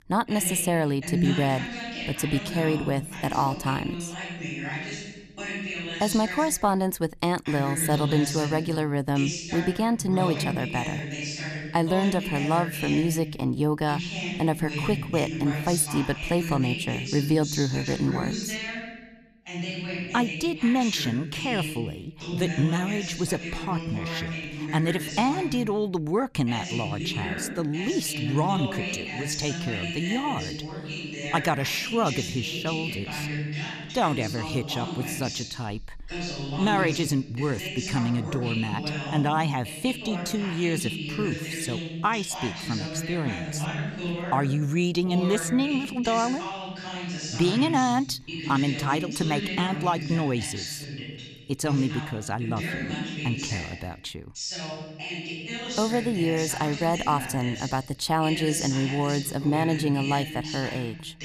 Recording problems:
voice in the background; loud; throughout; 5 dB below the speech

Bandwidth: 14 kHz